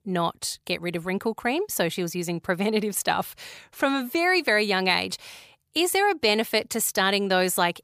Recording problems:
none

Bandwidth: 15 kHz